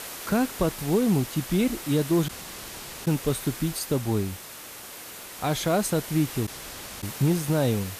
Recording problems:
hiss; noticeable; throughout; 10 dB below the speech
audio cutting out; at 2.5 s for 1 s and at 6.5 s for 0.5 s

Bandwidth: 14.5 kHz